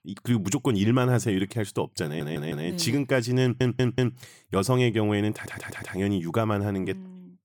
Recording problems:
audio stuttering; at 2 s, at 3.5 s and at 5.5 s

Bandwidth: 18 kHz